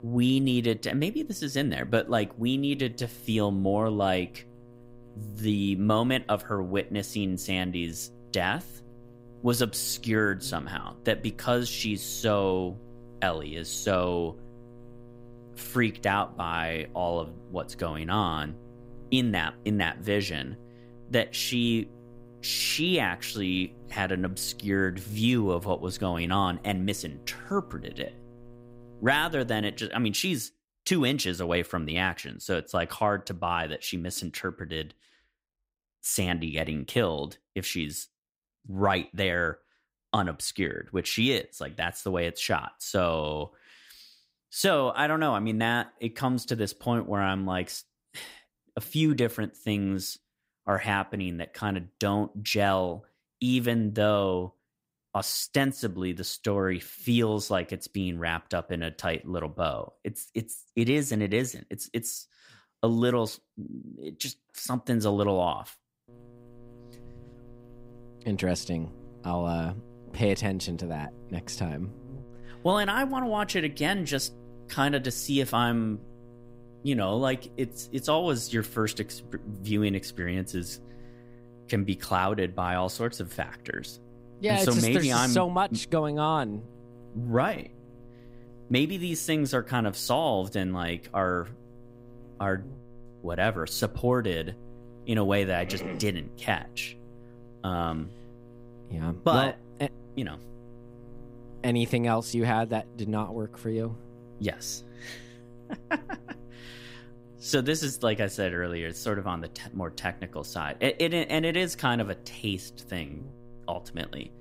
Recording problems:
electrical hum; faint; until 30 s and from 1:06 on; 60 Hz, 25 dB below the speech

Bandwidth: 15.5 kHz